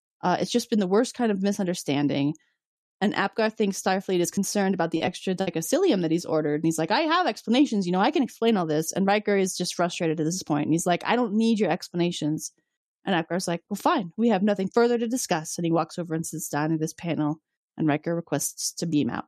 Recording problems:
choppy; very; from 4.5 to 5.5 s; 10% of the speech affected

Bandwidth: 14 kHz